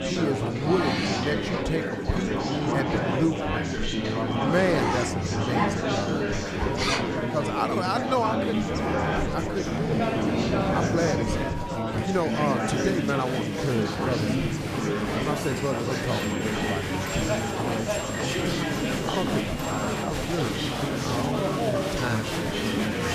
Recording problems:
chatter from many people; very loud; throughout; 3 dB above the speech
household noises; loud; throughout; 2 dB below the speech

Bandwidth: 15 kHz